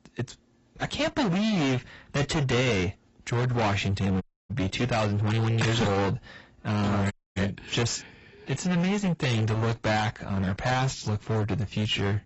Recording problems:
distortion; heavy; 30% of the sound clipped
garbled, watery; badly; nothing above 8 kHz
audio cutting out; at 4 s and at 7 s

